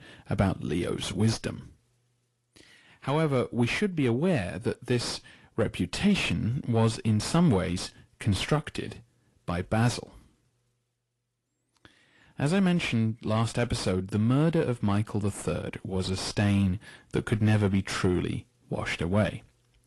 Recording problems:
distortion; slight; 10 dB below the speech
garbled, watery; slightly; nothing above 11 kHz

